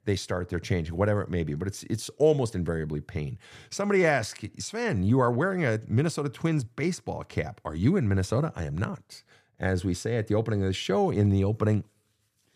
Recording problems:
none

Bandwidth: 14.5 kHz